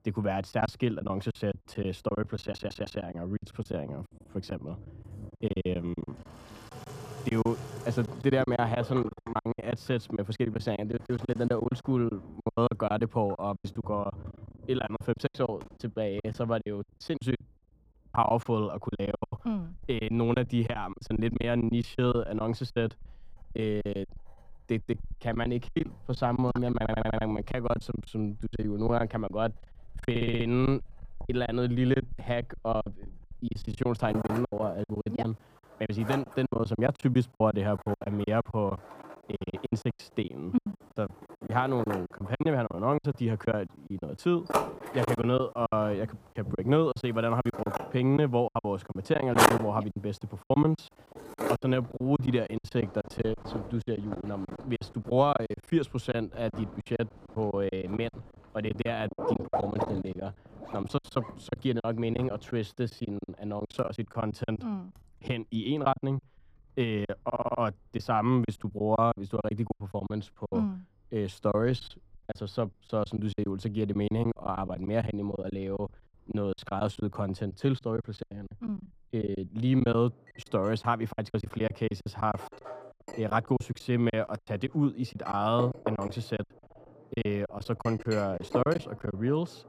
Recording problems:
muffled; very; fading above 1.5 kHz
household noises; loud; throughout; 8 dB below the speech
choppy; very; 15% of the speech affected
audio stuttering; 4 times, first at 2.5 s

